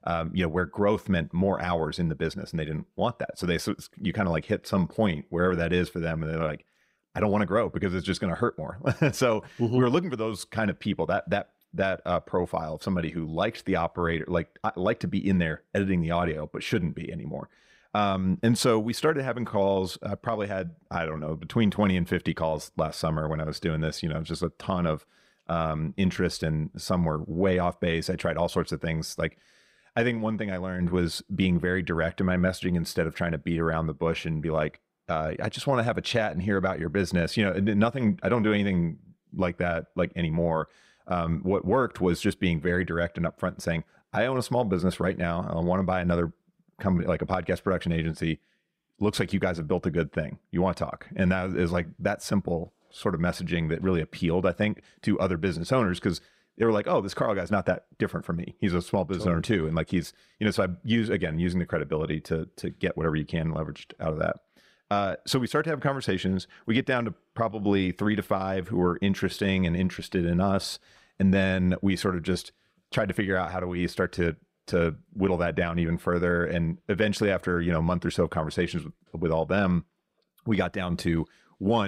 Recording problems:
abrupt cut into speech; at the end

